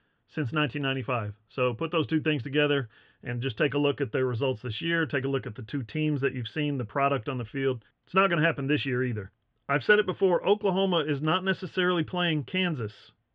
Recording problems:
muffled; very; fading above 3.5 kHz

